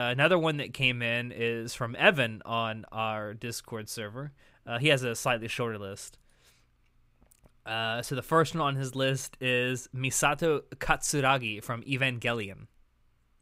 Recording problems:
abrupt cut into speech; at the start

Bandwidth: 15.5 kHz